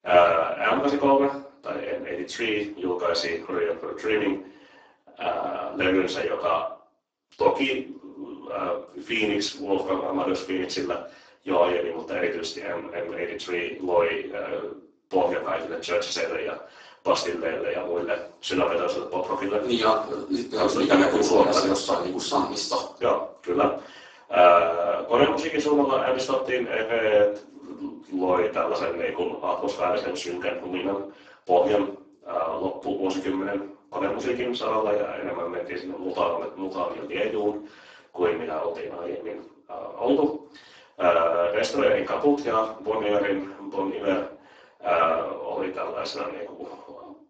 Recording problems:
off-mic speech; far
garbled, watery; badly; nothing above 7.5 kHz
room echo; slight; dies away in 0.4 s
thin; very slightly; fading below 300 Hz

